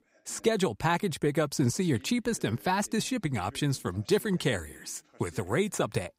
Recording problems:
voice in the background; faint; throughout; 25 dB below the speech

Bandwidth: 15.5 kHz